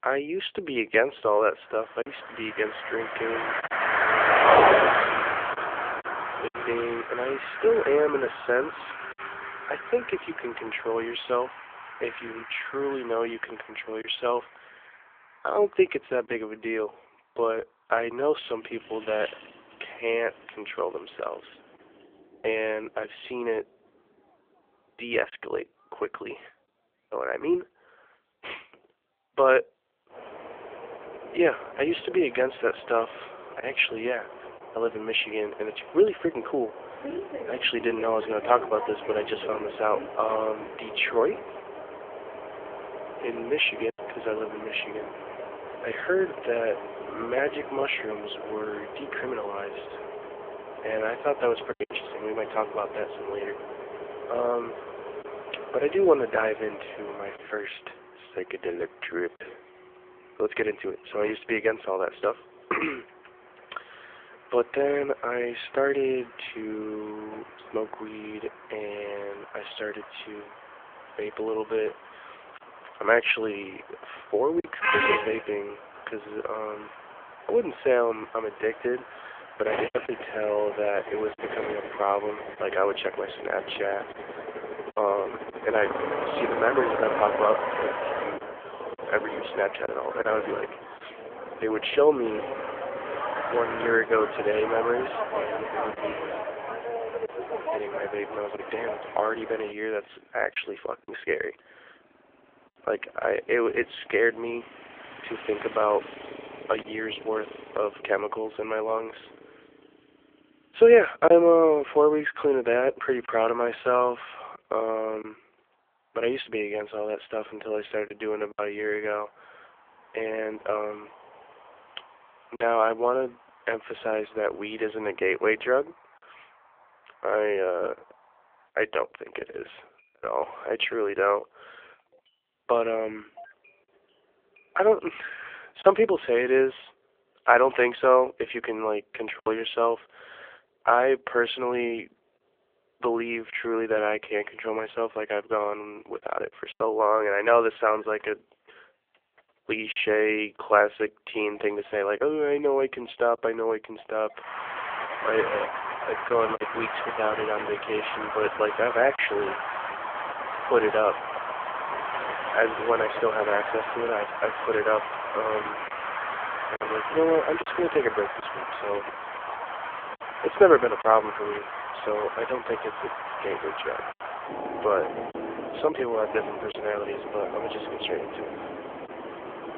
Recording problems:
phone-call audio; poor line; nothing above 3.5 kHz
traffic noise; loud; throughout; 5 dB below the speech
choppy; occasionally; 1% of the speech affected

